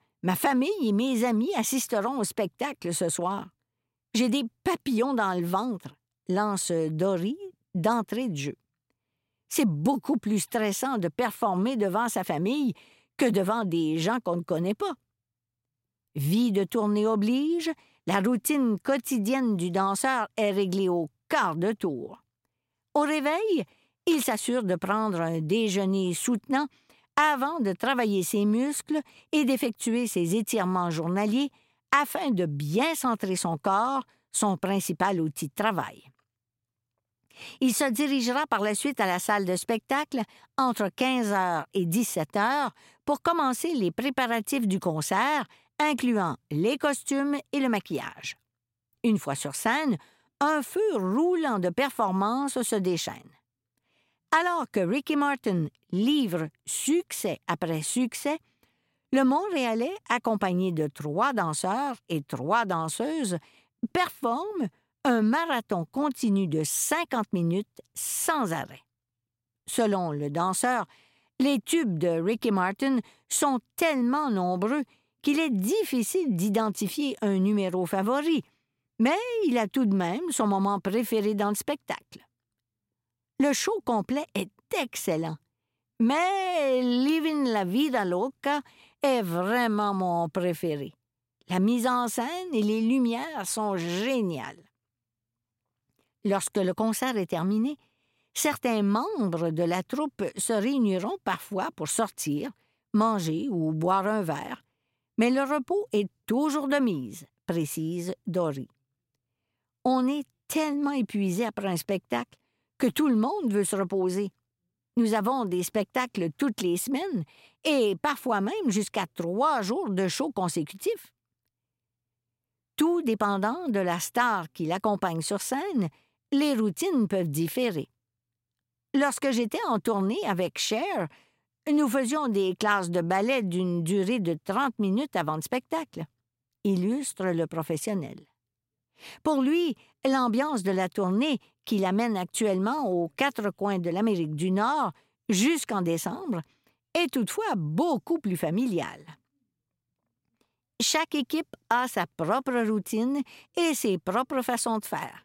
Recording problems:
none

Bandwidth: 16 kHz